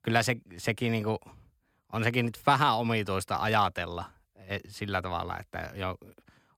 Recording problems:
none

